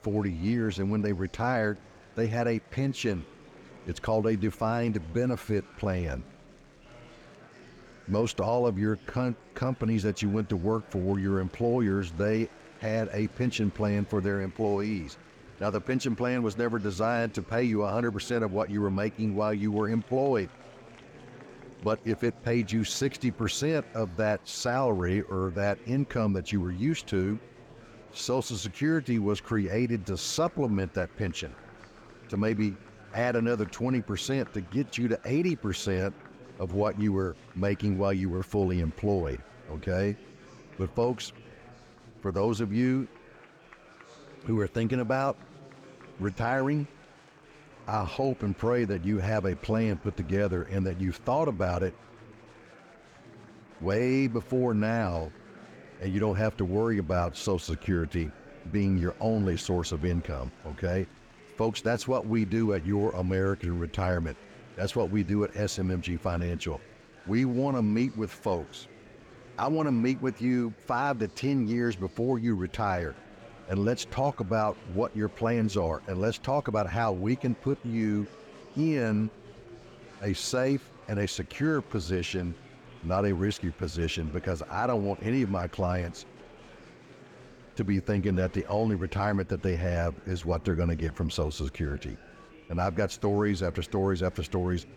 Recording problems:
murmuring crowd; faint; throughout; 20 dB below the speech

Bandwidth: 18 kHz